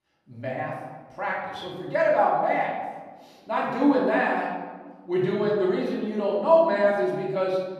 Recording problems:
off-mic speech; far
room echo; noticeable; dies away in 1.2 s

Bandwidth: 14.5 kHz